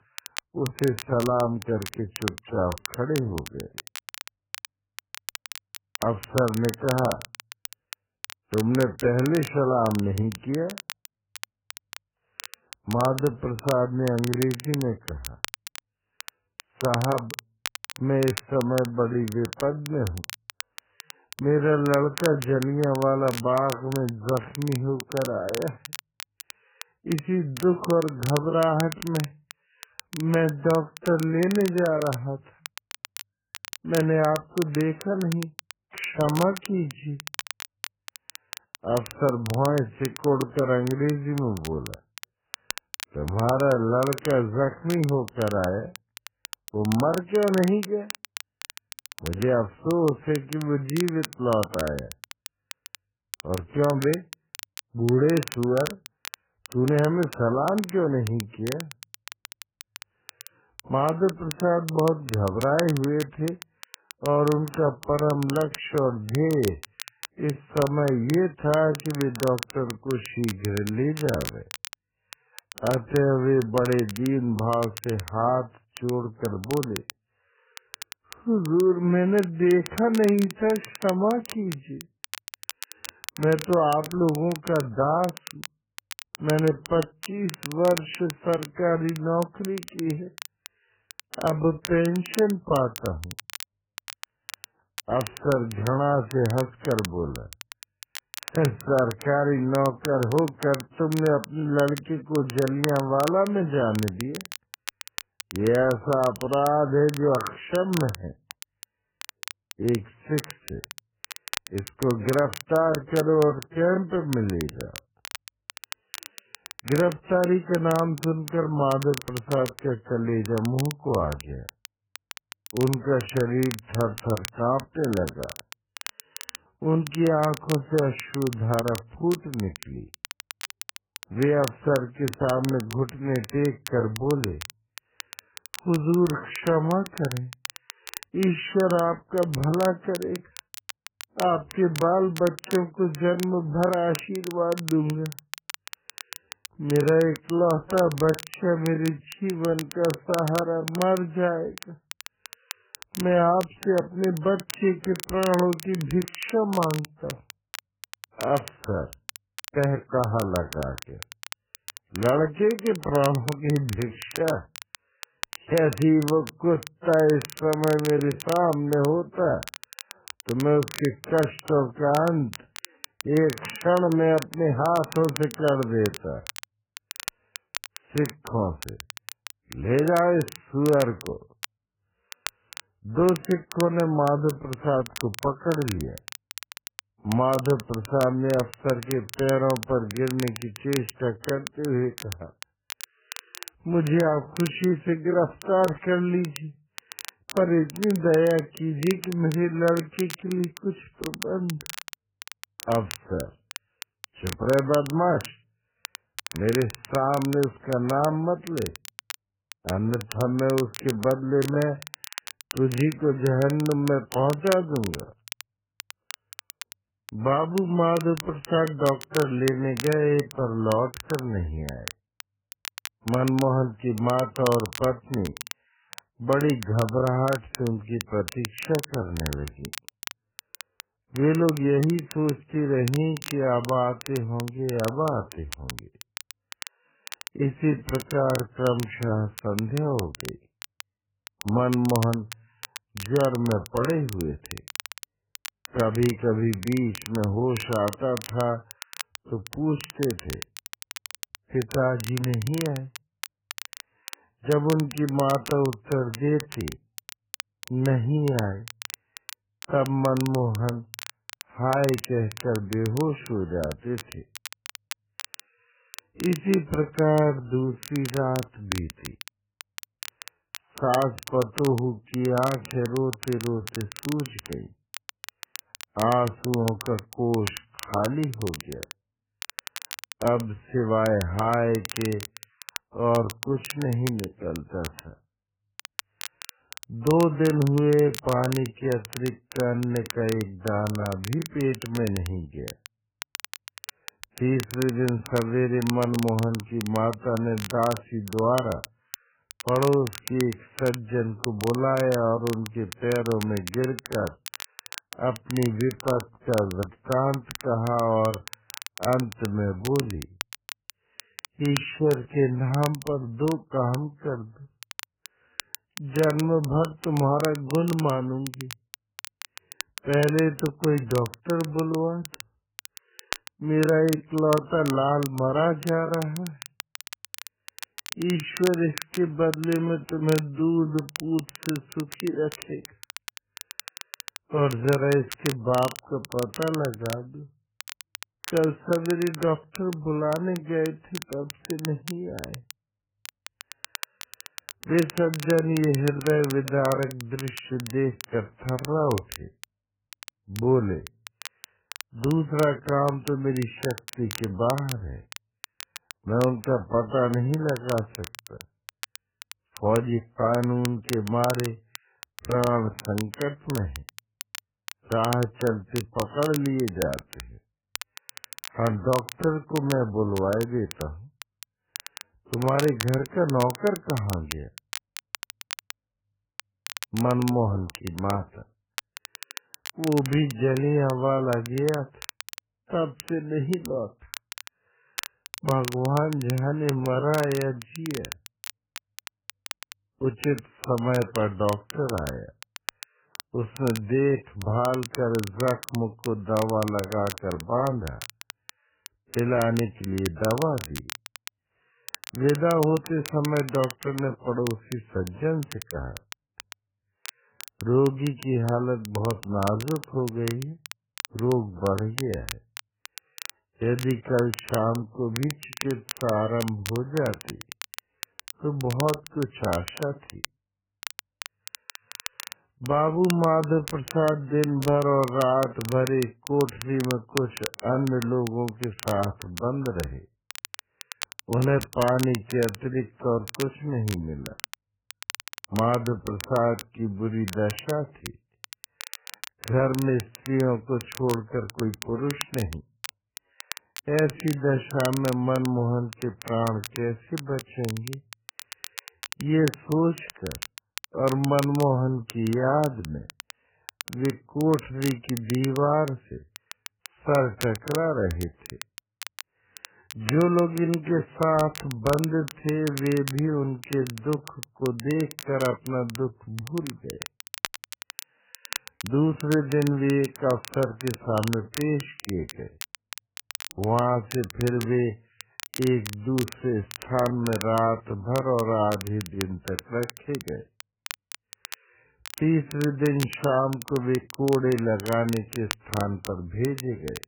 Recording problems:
garbled, watery; badly; nothing above 3 kHz
wrong speed, natural pitch; too slow; 0.6 times normal speed
crackle, like an old record; noticeable; 15 dB below the speech

